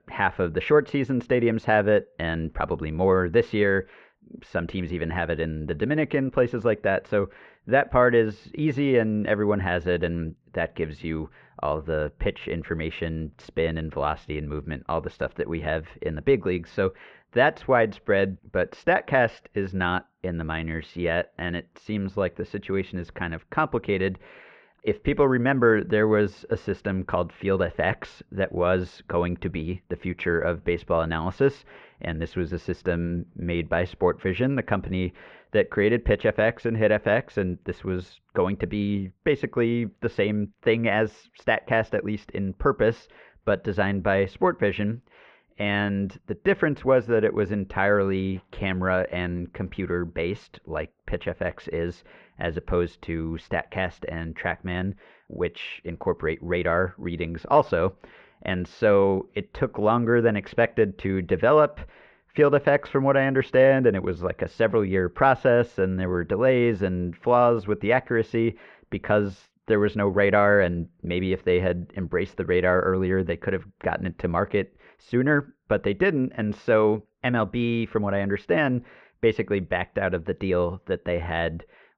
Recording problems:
muffled; very; fading above 2 kHz

